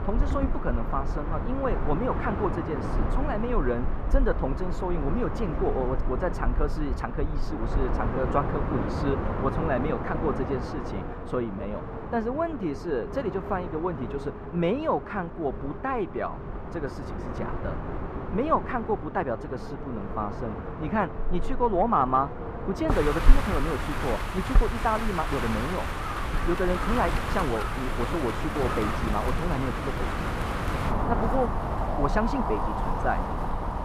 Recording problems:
muffled; very; fading above 3.5 kHz
wind in the background; loud; throughout; 1 dB below the speech

